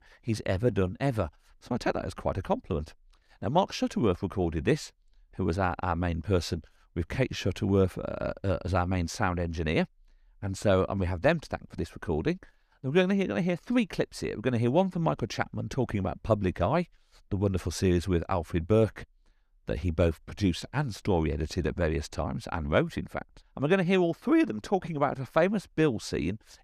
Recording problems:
none

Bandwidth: 14.5 kHz